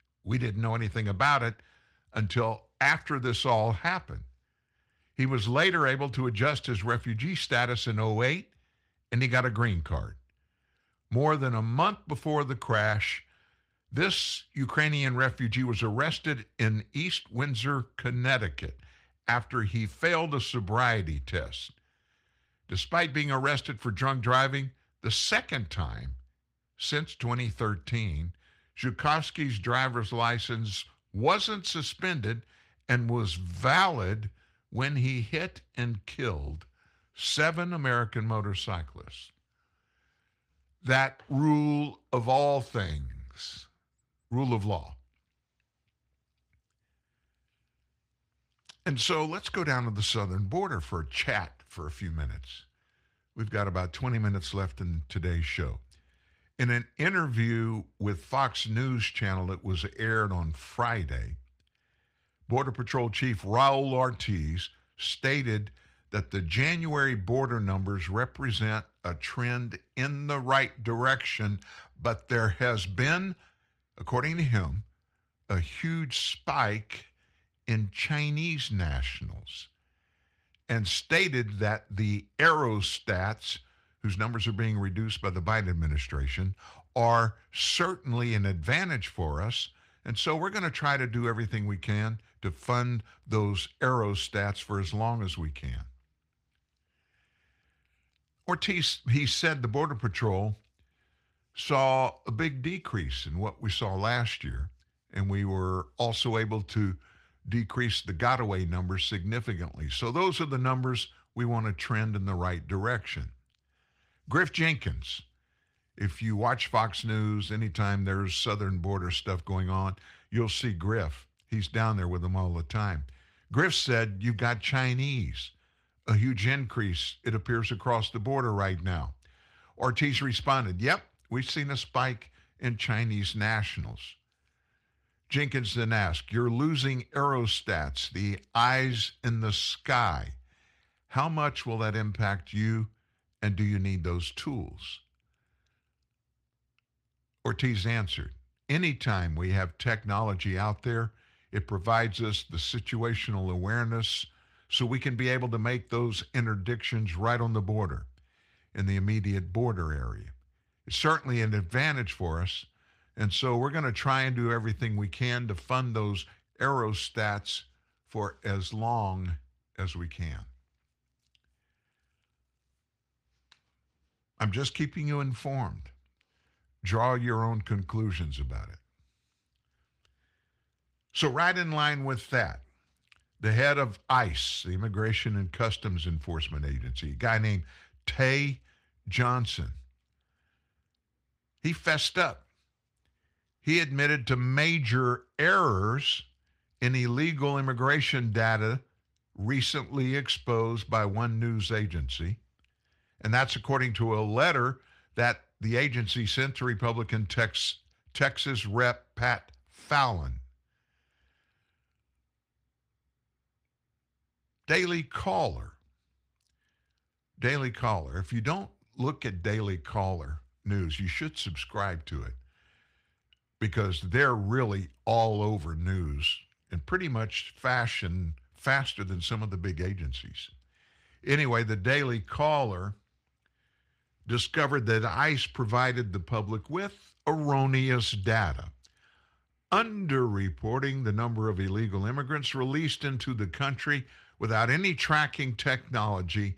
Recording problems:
garbled, watery; slightly; nothing above 15.5 kHz

